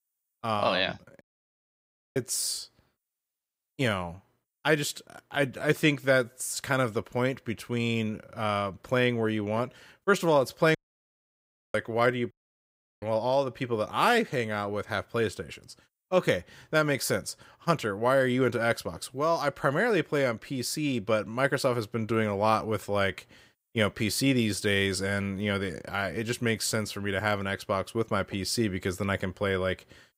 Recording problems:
audio cutting out; at 1 s for 1 s, at 11 s for 1 s and at 12 s for 0.5 s

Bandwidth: 15.5 kHz